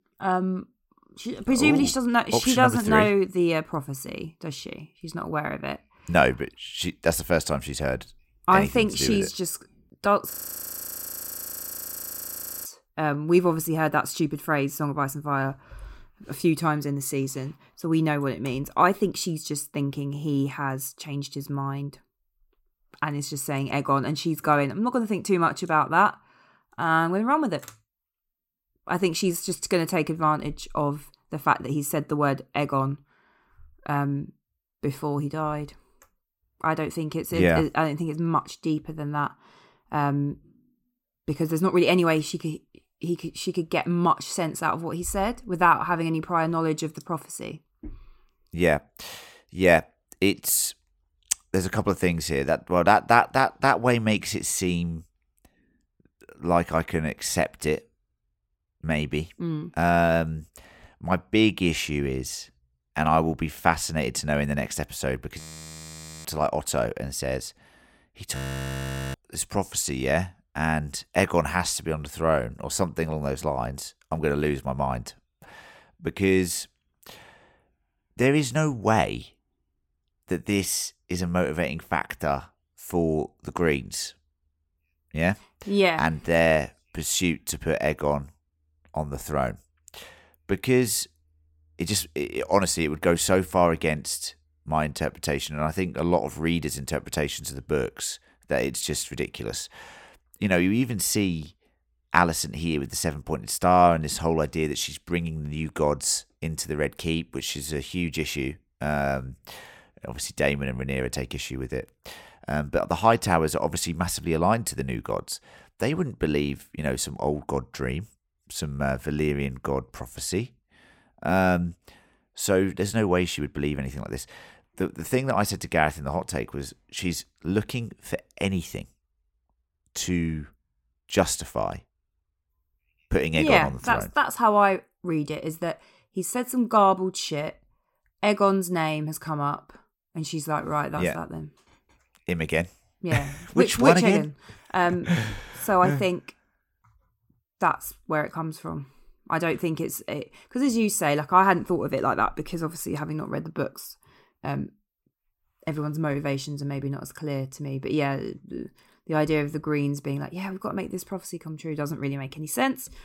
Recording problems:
audio freezing; at 10 s for 2.5 s, at 1:05 for 1 s and at 1:08 for 1 s

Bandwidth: 16.5 kHz